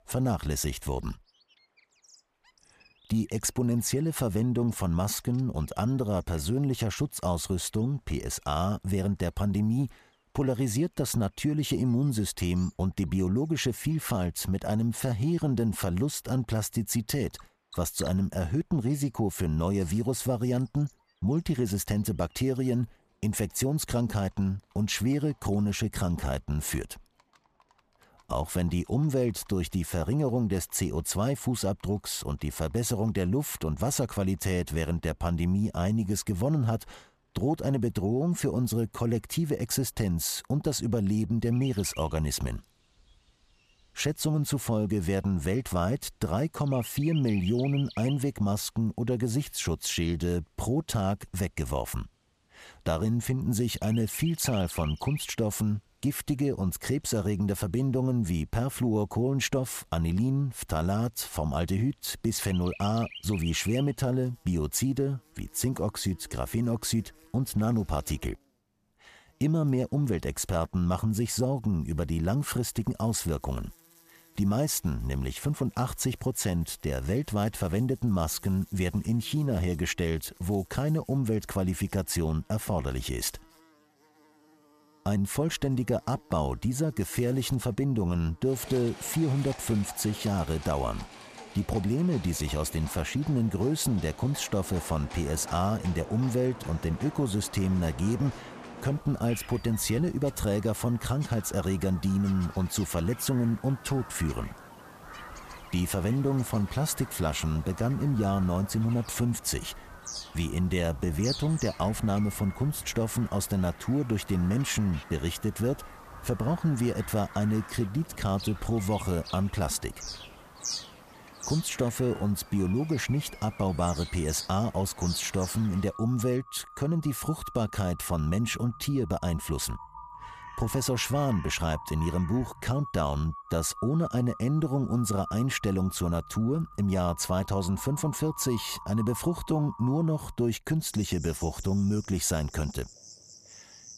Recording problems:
animal sounds; noticeable; throughout; 15 dB below the speech

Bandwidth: 14.5 kHz